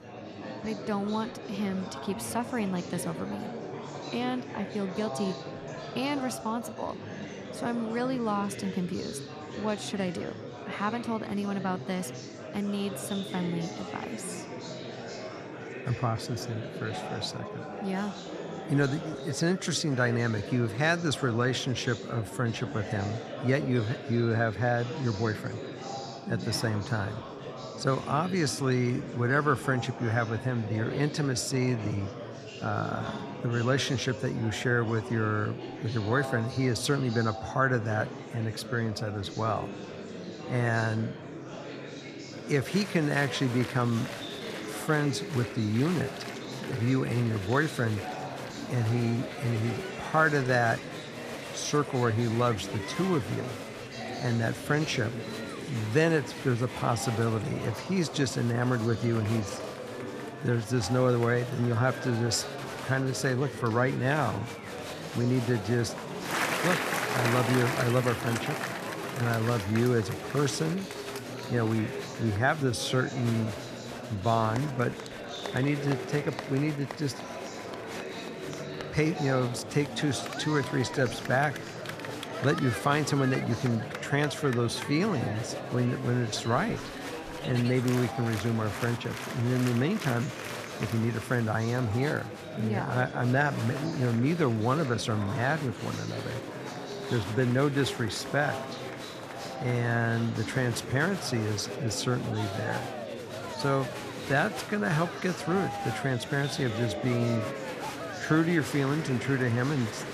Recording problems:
murmuring crowd; loud; throughout; 8 dB below the speech

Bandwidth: 14.5 kHz